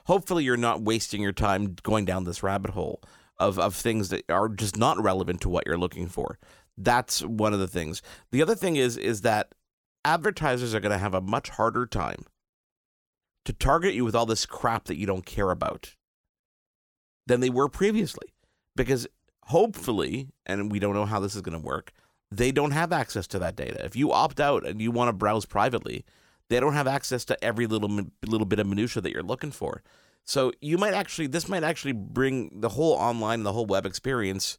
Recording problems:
none

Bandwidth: 18 kHz